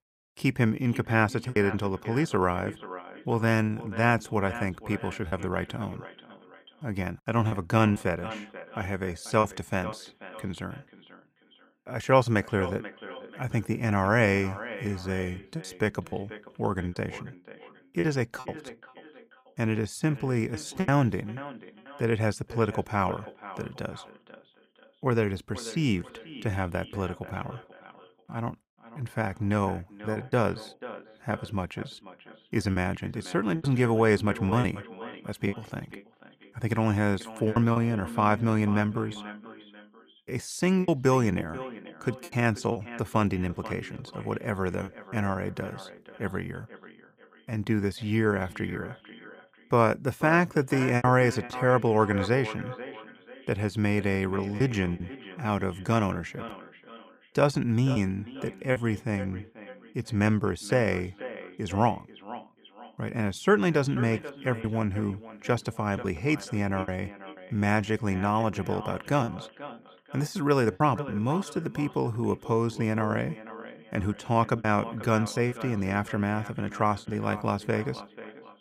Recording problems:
echo of what is said; noticeable; throughout; 490 ms later, 15 dB below the speech
choppy; occasionally; 5% of the speech affected

